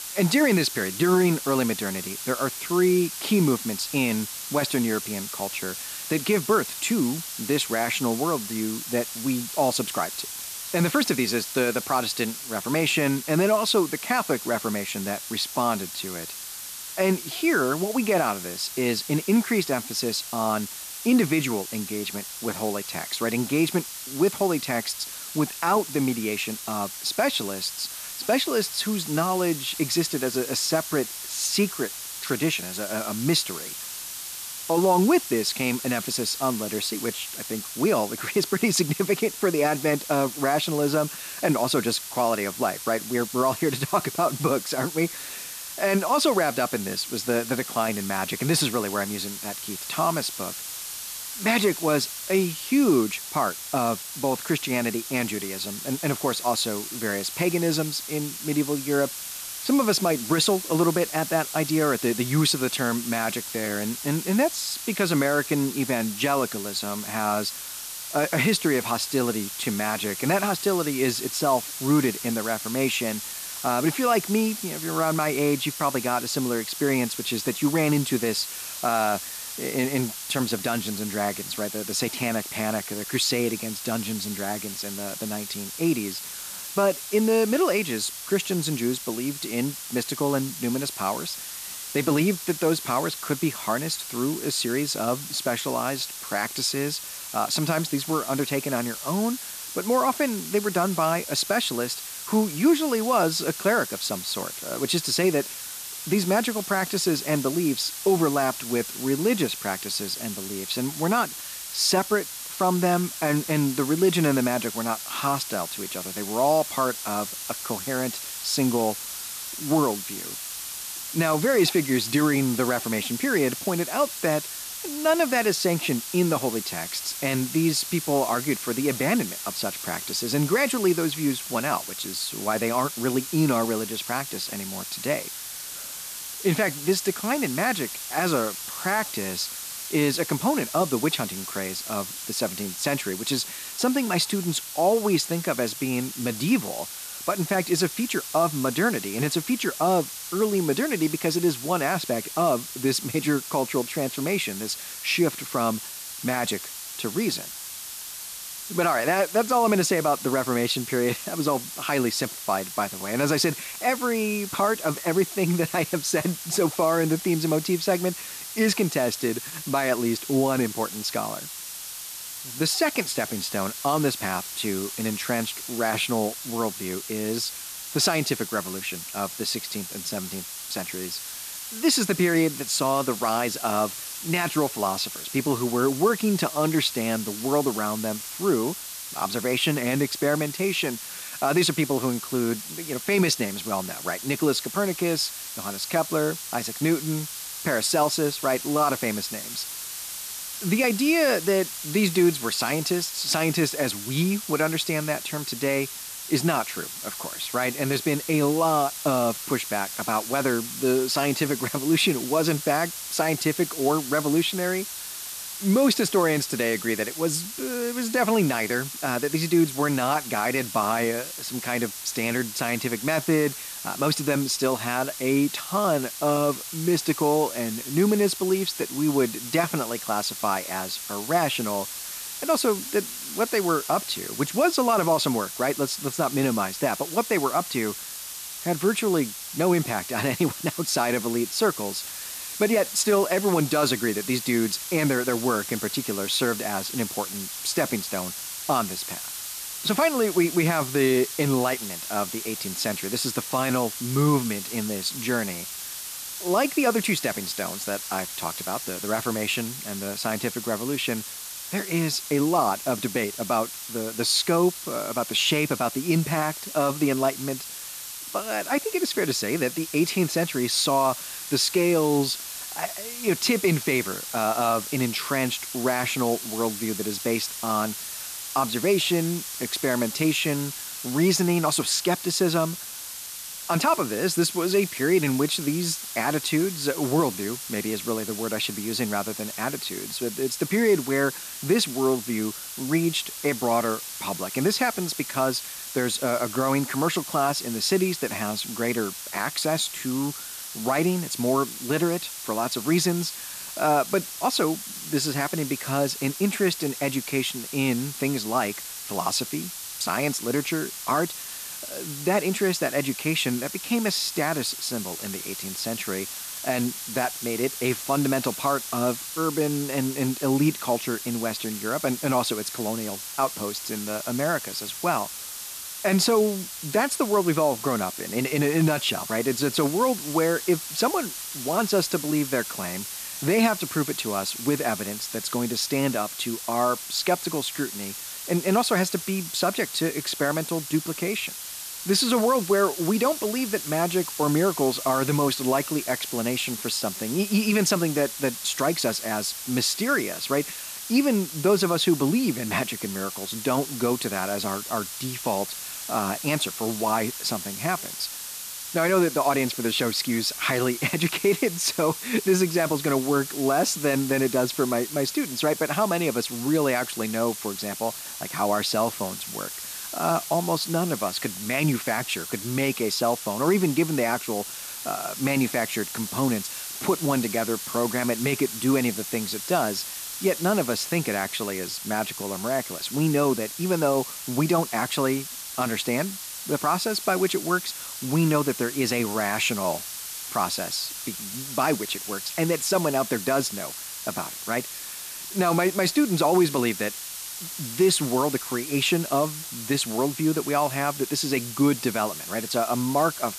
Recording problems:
hiss; loud; throughout; 7 dB below the speech

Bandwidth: 14.5 kHz